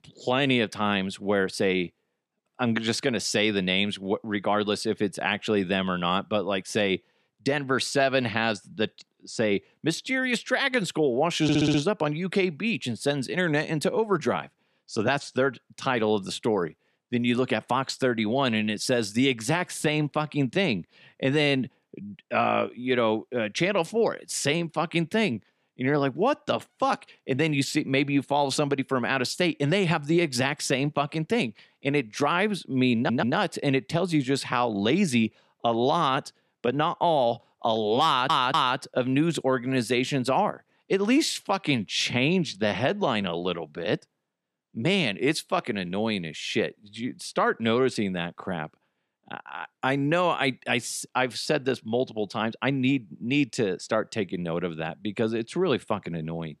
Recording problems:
audio stuttering; at 11 s, at 33 s and at 38 s

